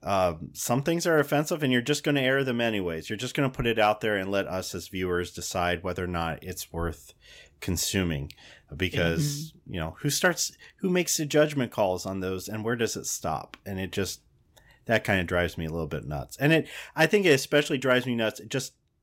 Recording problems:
none

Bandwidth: 16 kHz